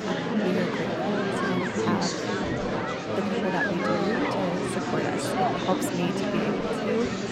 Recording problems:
murmuring crowd; very loud; throughout; 5 dB above the speech

